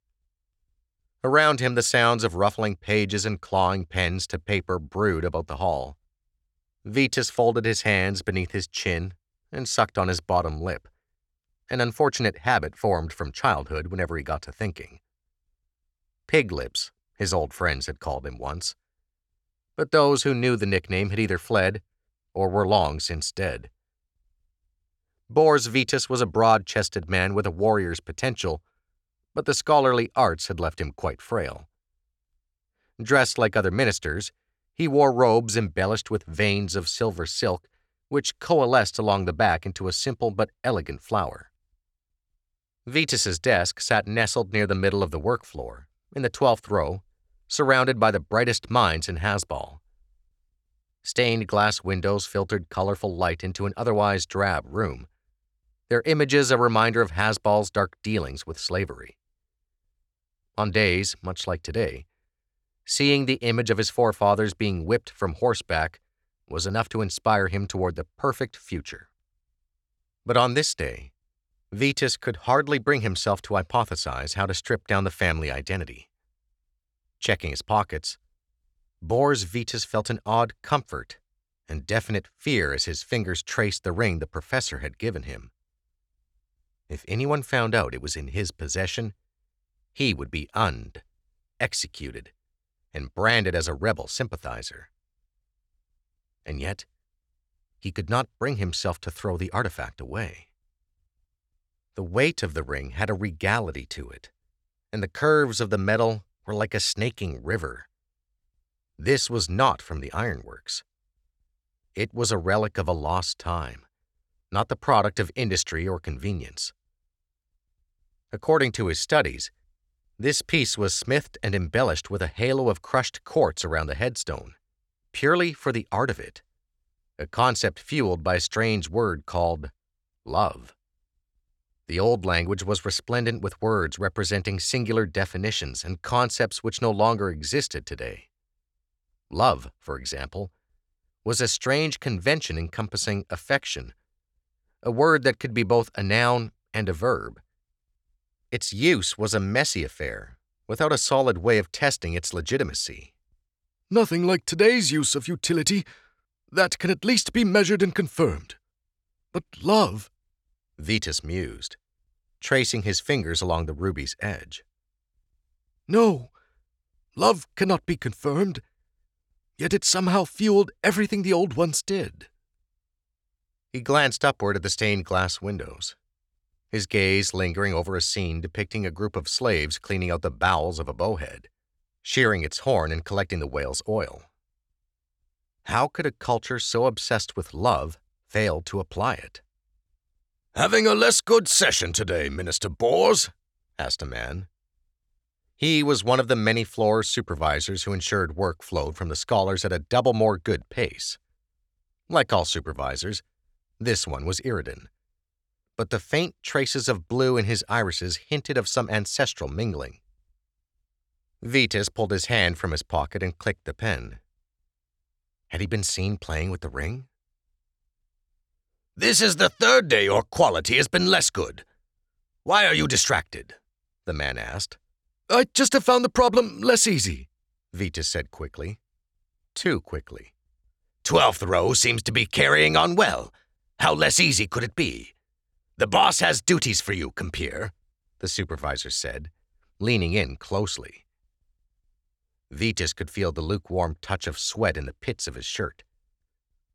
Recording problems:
none

